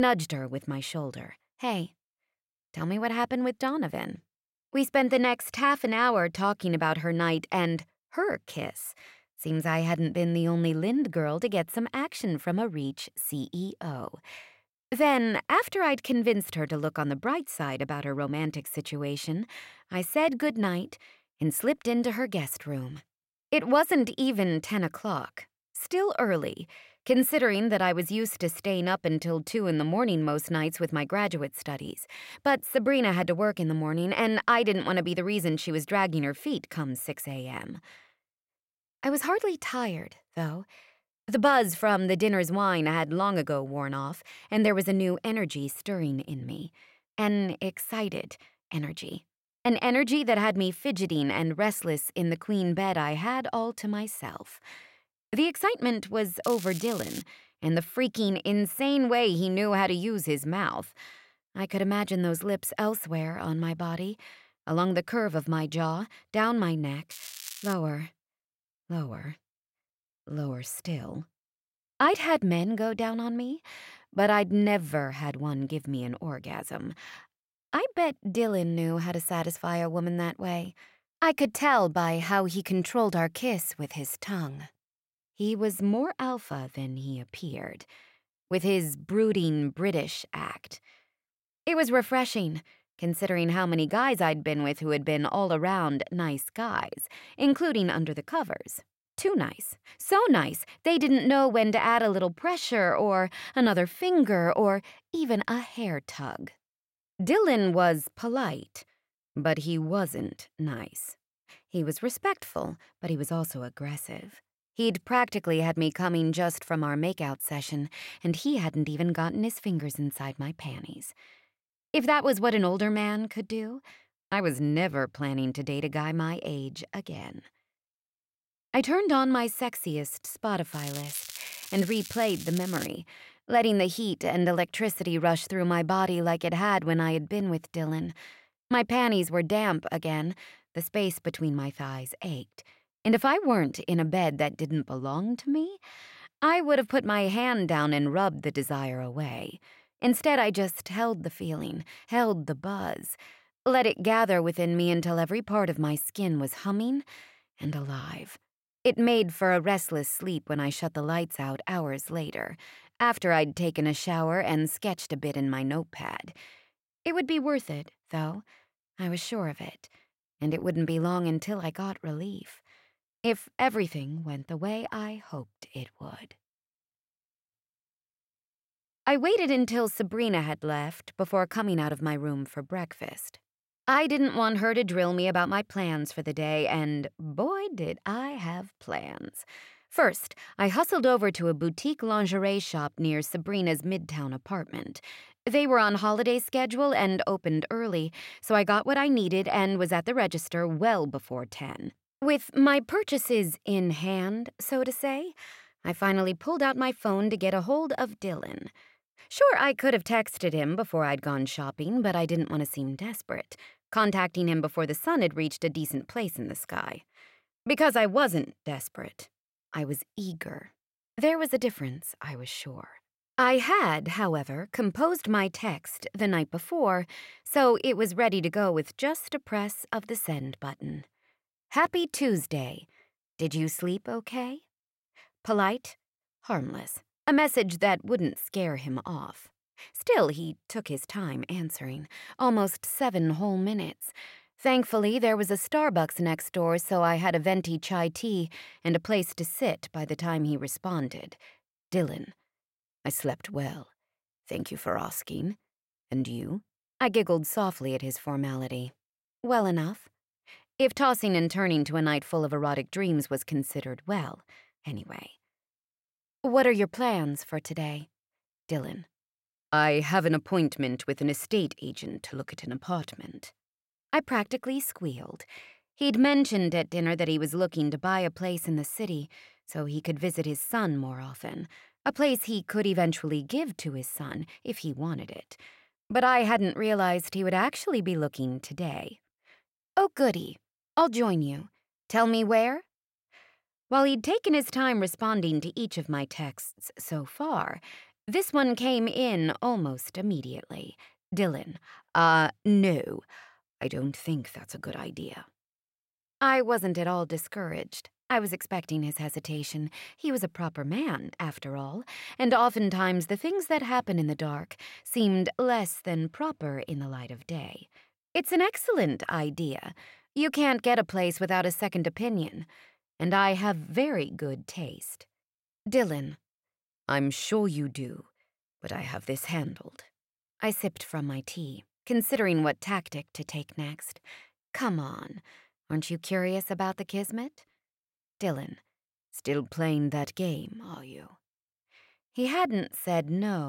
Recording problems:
crackling; noticeable; at 56 s, at 1:07 and from 2:11 to 2:13; 10 dB below the speech
abrupt cut into speech; at the start and the end

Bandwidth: 16 kHz